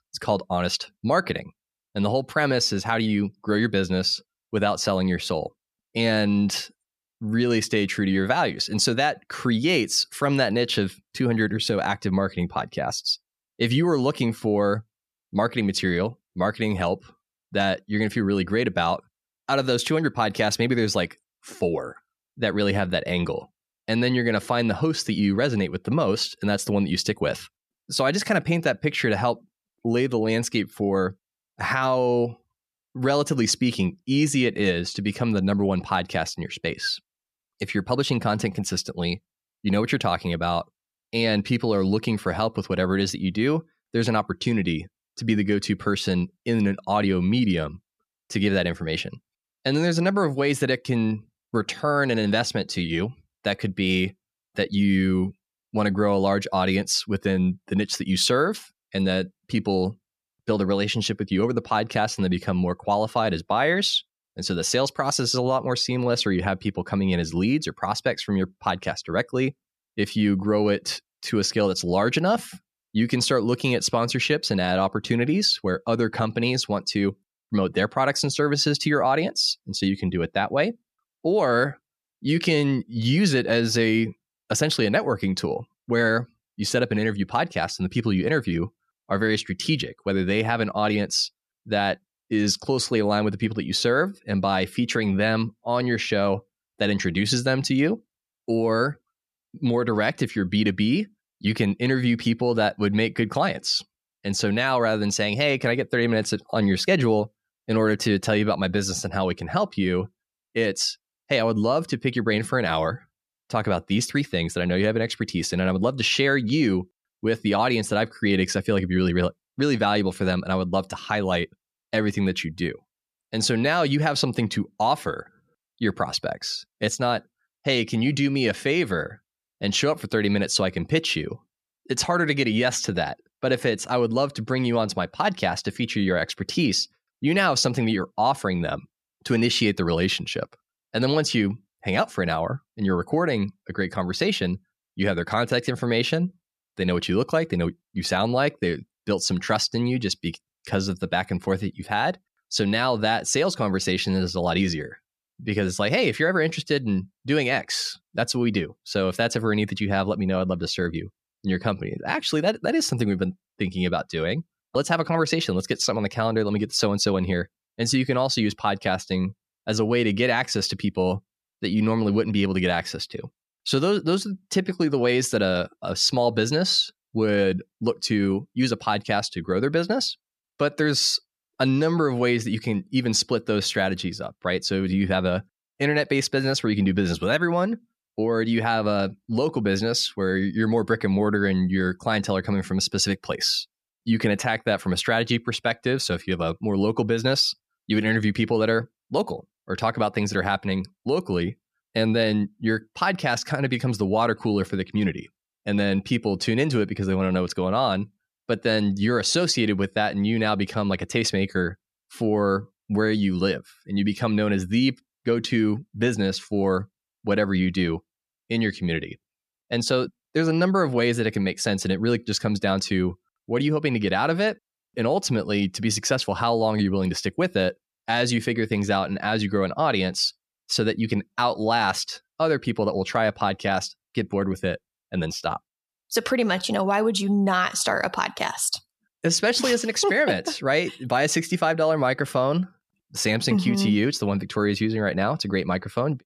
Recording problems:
none

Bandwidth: 14.5 kHz